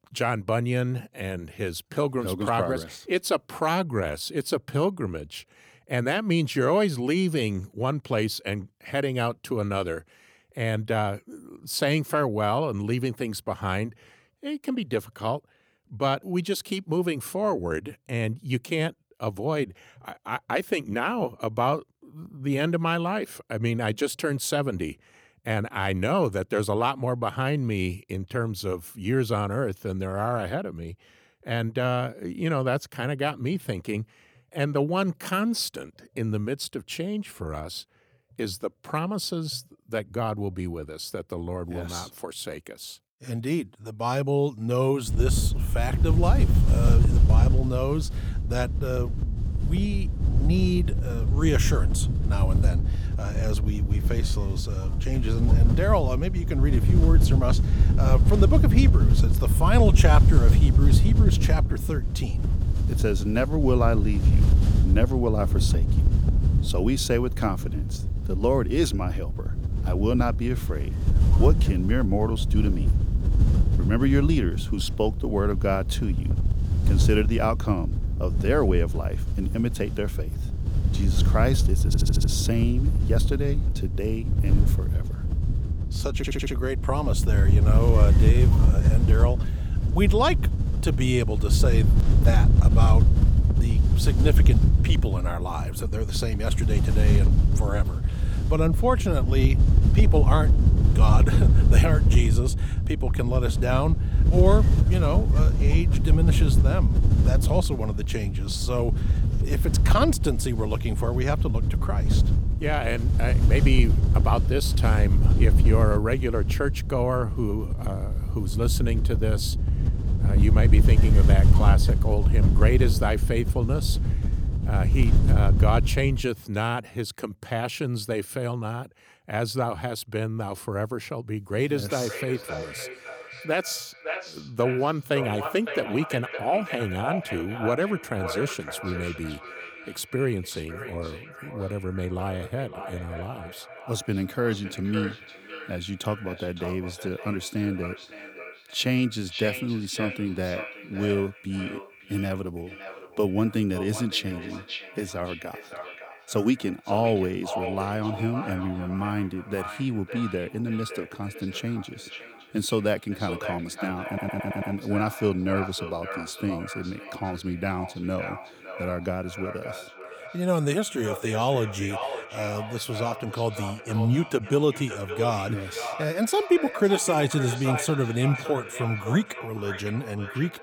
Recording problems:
echo of what is said; strong; from 2:12 on; 560 ms later, 9 dB below the speech
wind noise on the microphone; heavy; from 45 s to 2:06; 8 dB below the speech
audio stuttering; at 1:22, at 1:26 and at 2:44

